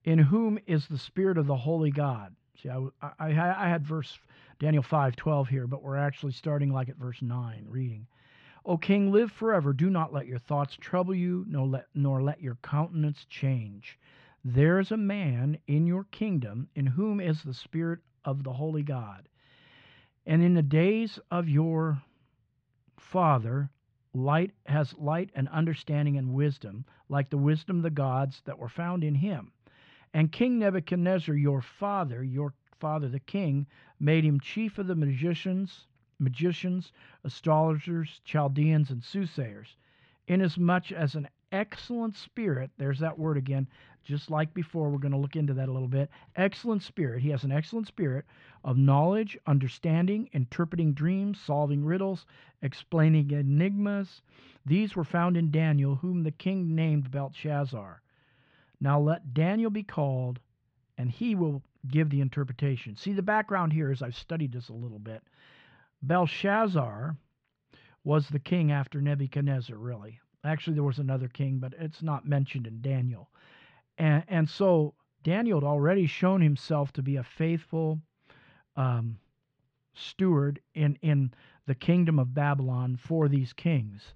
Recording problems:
muffled; slightly; fading above 3.5 kHz

